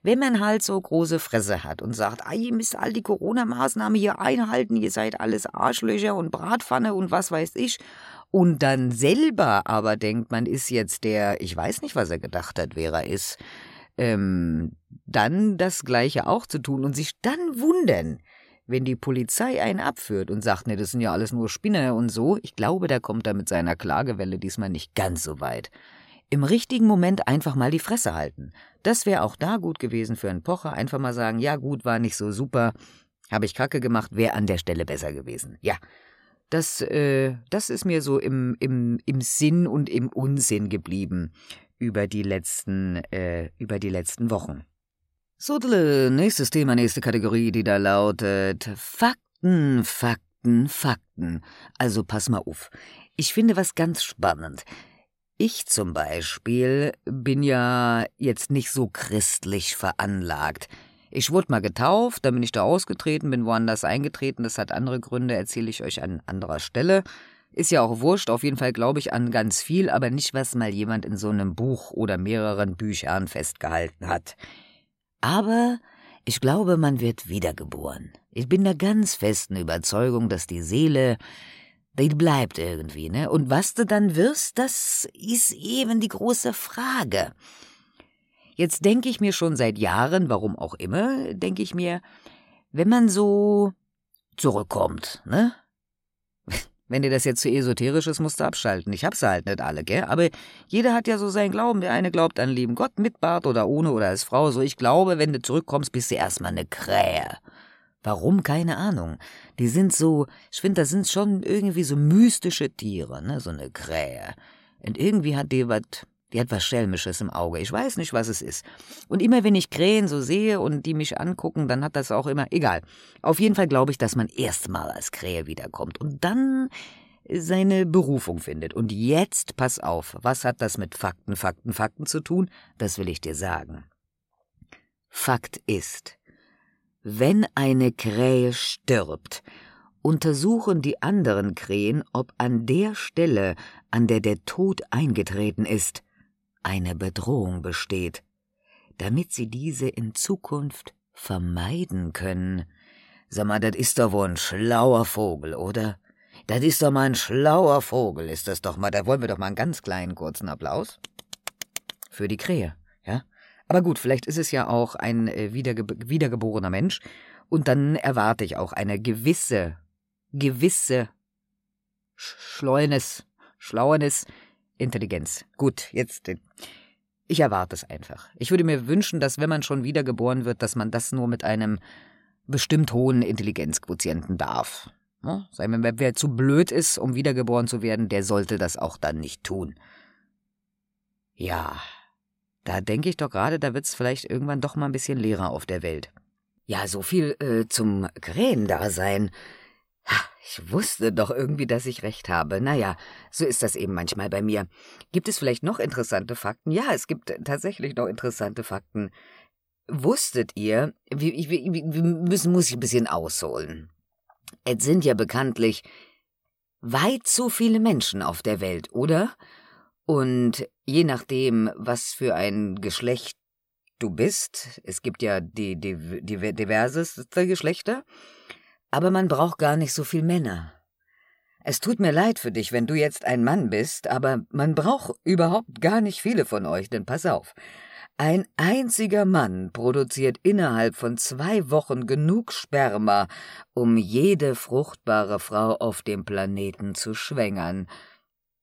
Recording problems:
none

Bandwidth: 16 kHz